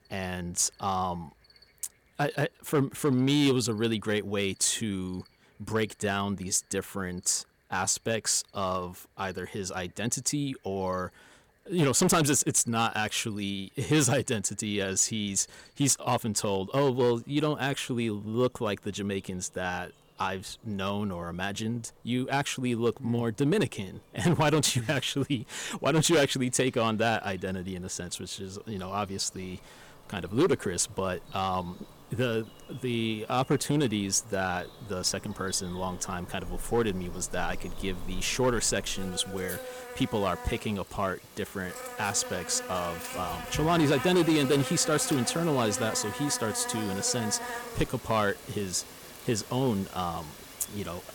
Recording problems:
distortion; slight; 3% of the sound clipped
animal sounds; noticeable; throughout; 10 dB below the speech

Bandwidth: 17.5 kHz